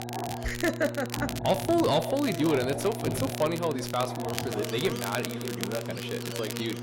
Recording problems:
echo of what is said; noticeable; from 2 s on; 580 ms later, 15 dB below the speech
distortion; slight; 10 dB below the speech
animal sounds; loud; throughout; 9 dB below the speech
crackle, like an old record; loud; 10 dB below the speech
electrical hum; noticeable; throughout; 60 Hz, 15 dB below the speech

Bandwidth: 16 kHz